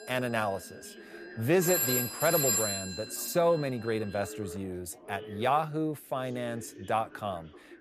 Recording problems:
alarms or sirens; very loud; throughout; 1 dB above the speech
background chatter; noticeable; throughout; 3 voices, 20 dB below the speech

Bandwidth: 14.5 kHz